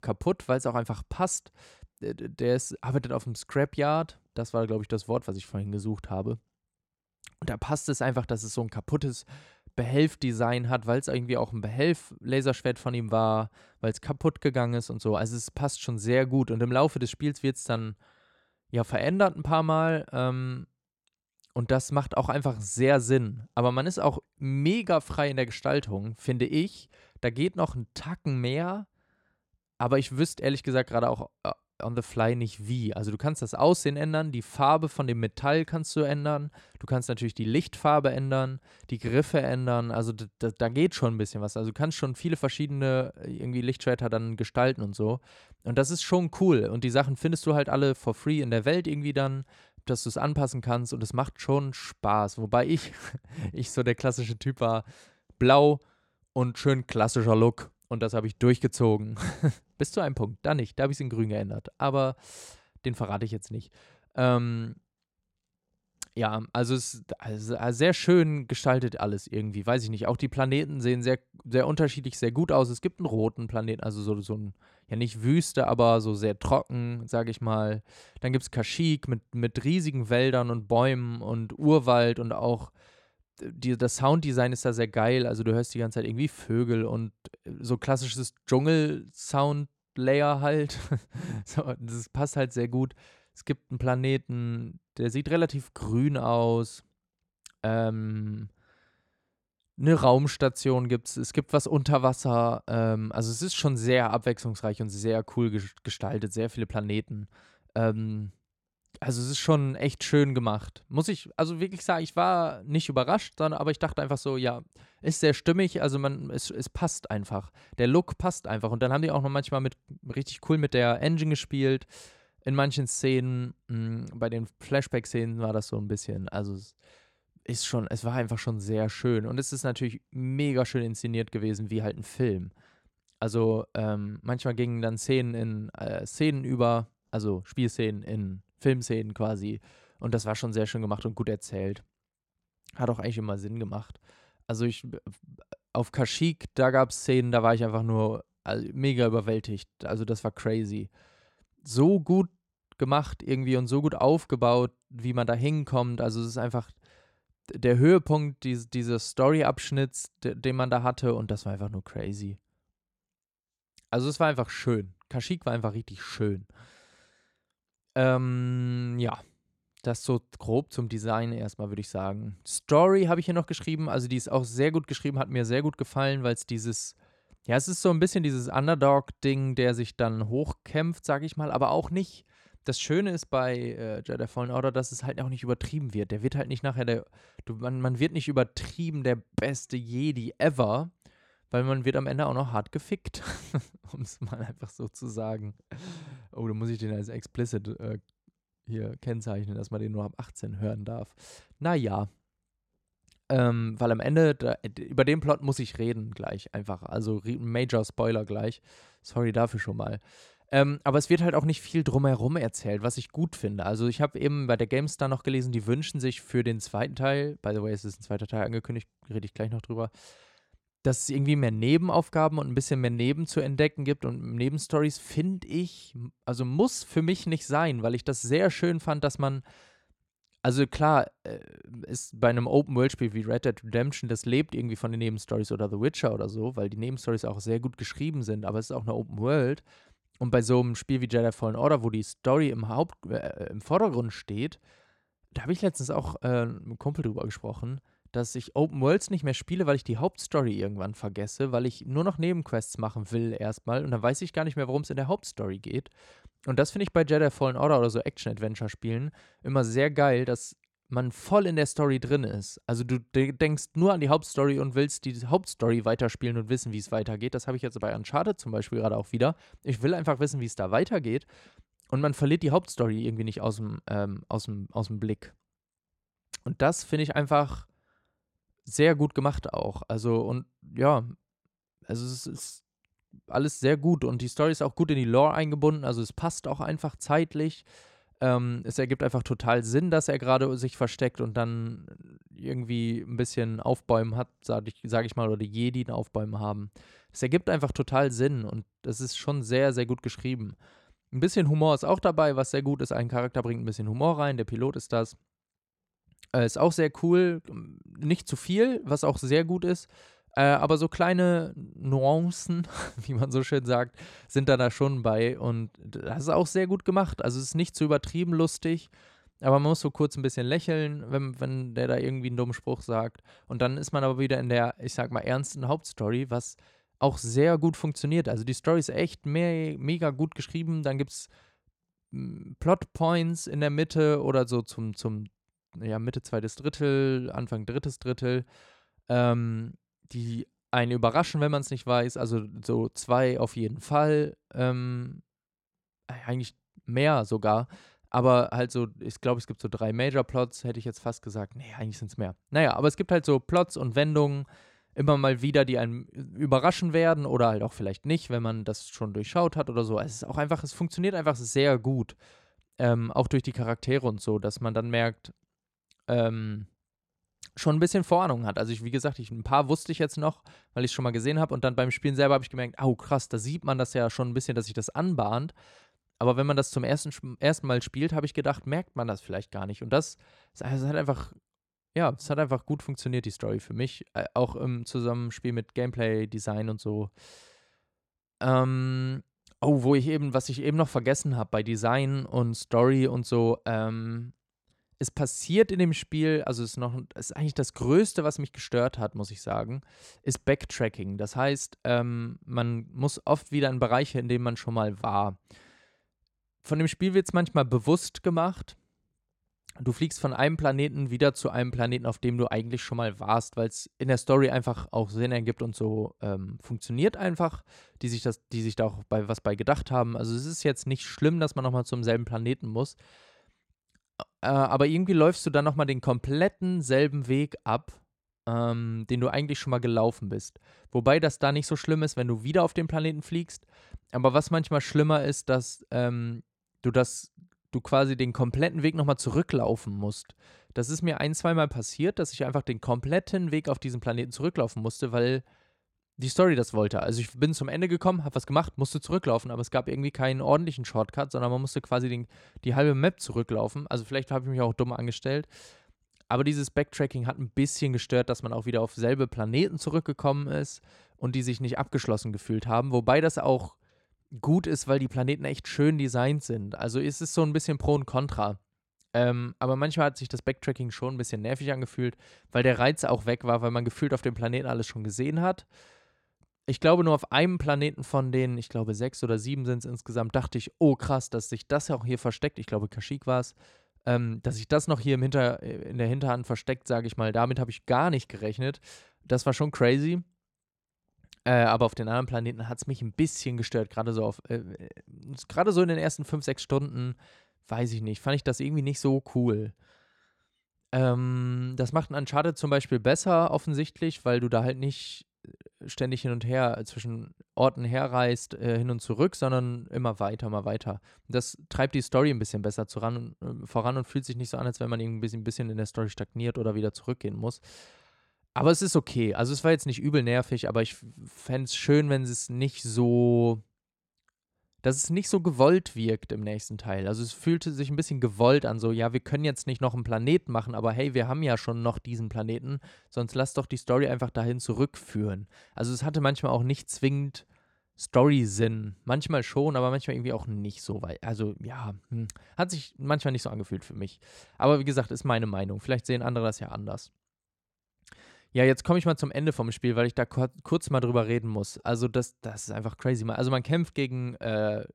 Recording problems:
none

